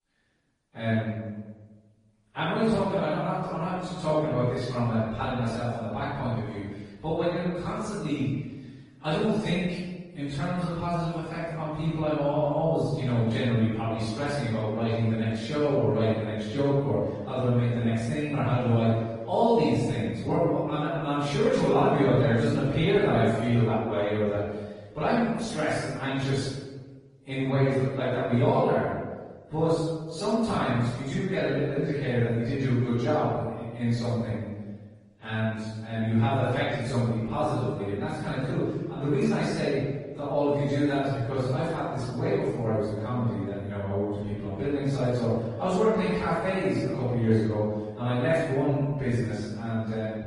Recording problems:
room echo; strong; dies away in 1.1 s
off-mic speech; far
garbled, watery; slightly; nothing above 10.5 kHz

